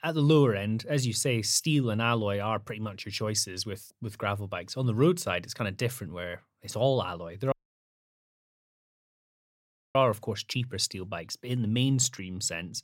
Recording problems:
audio cutting out; at 7.5 s for 2.5 s

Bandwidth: 16 kHz